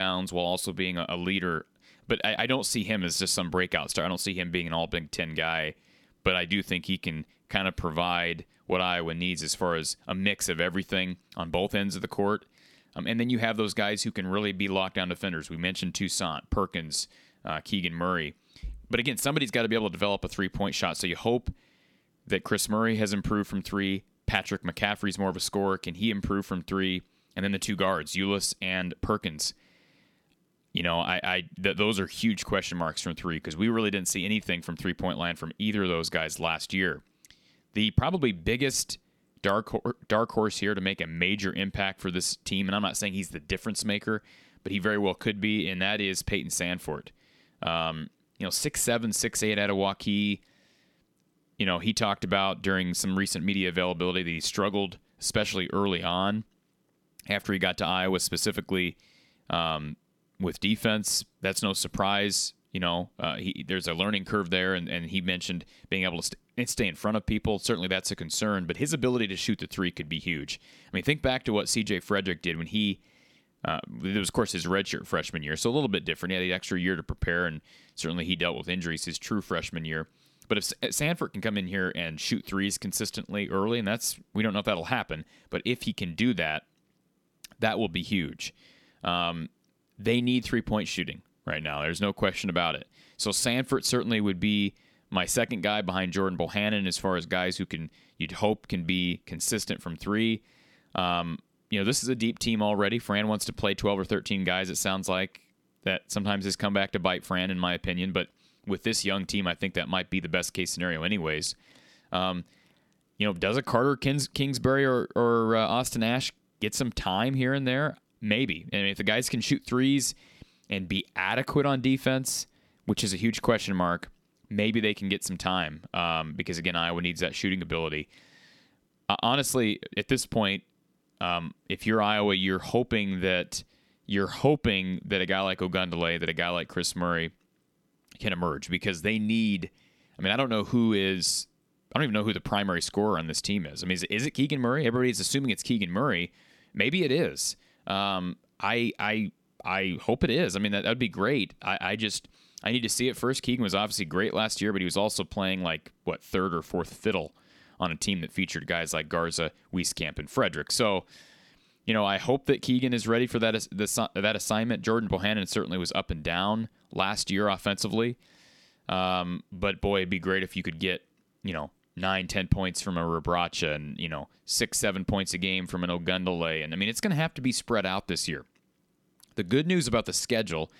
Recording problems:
abrupt cut into speech; at the start

